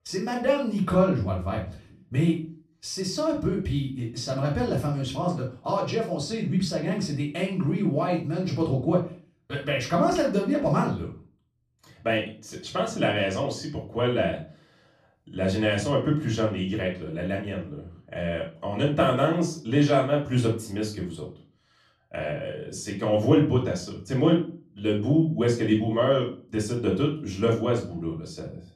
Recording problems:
off-mic speech; far
room echo; slight; dies away in 0.3 s

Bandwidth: 14.5 kHz